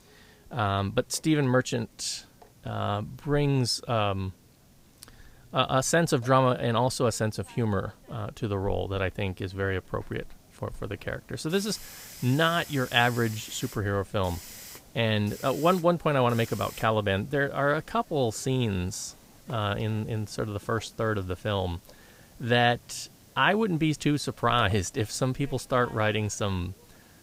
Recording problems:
hiss; faint; throughout; 20 dB below the speech

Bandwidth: 15.5 kHz